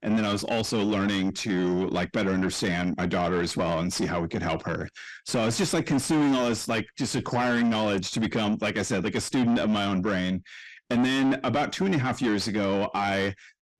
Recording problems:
distortion; heavy; 7 dB below the speech

